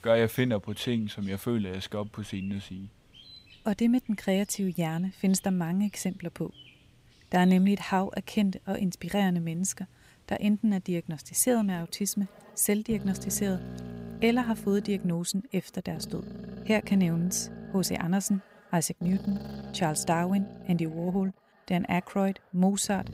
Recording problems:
animal sounds; noticeable; throughout; 15 dB below the speech

